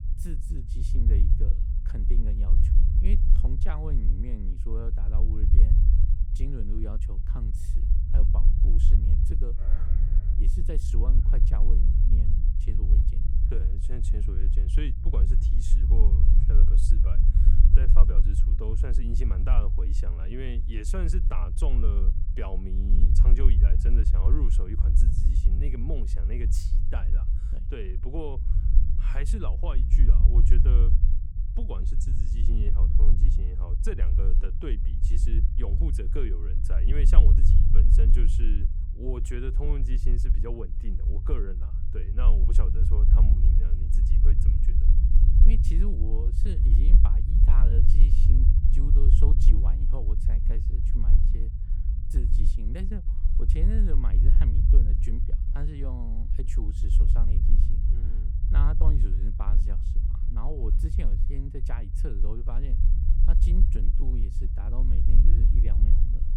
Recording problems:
low rumble; loud; throughout; 2 dB below the speech
dog barking; faint; at 9.5 s; peak 10 dB below the speech

